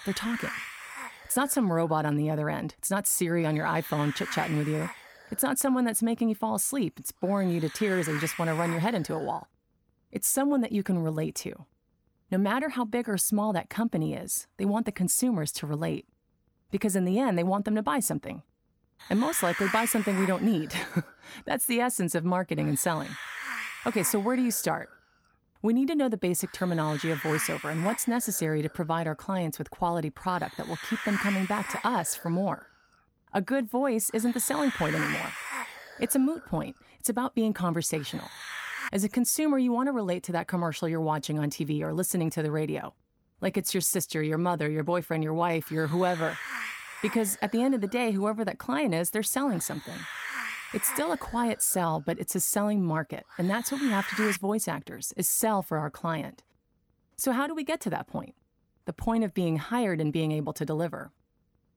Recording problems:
hiss; loud; until 9.5 s, from 19 to 39 s and from 44 to 54 s; 8 dB below the speech

